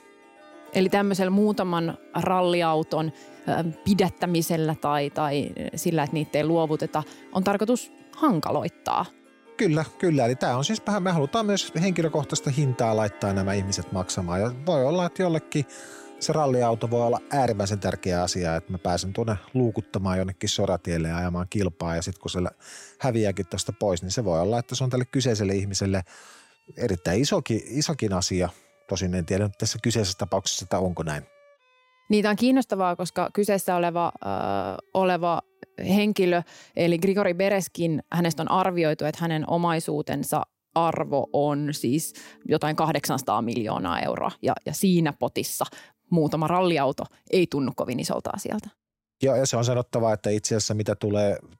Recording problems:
background music; faint; throughout; 25 dB below the speech

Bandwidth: 16 kHz